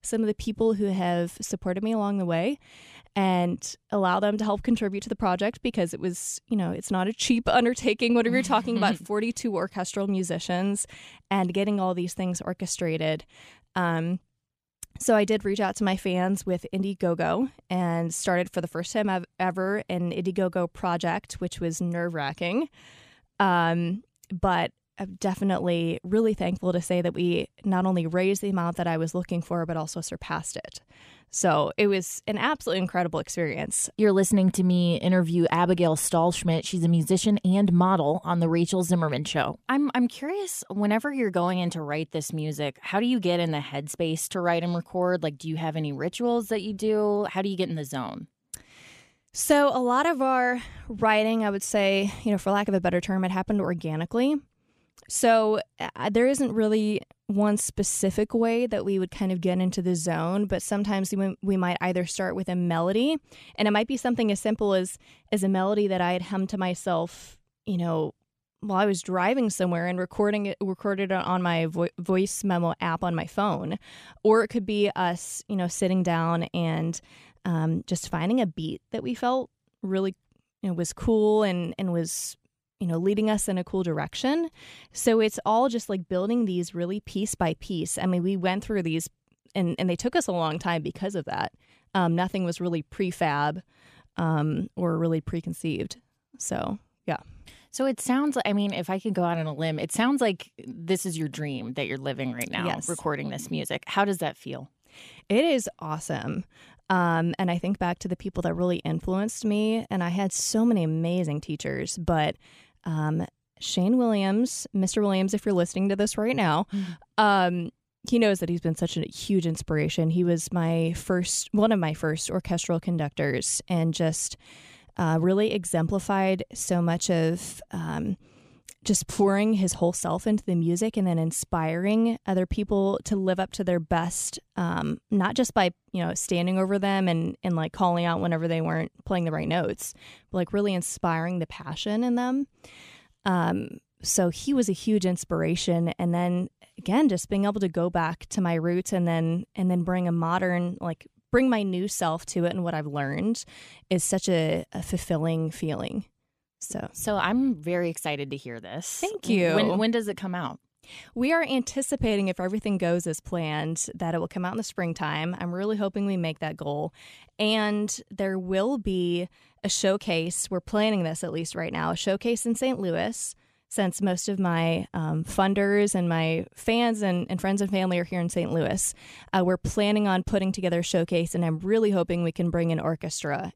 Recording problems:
none

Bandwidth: 14.5 kHz